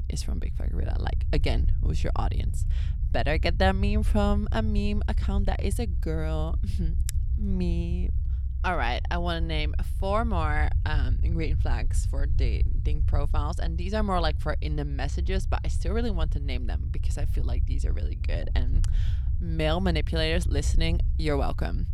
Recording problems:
low rumble; noticeable; throughout; 15 dB below the speech

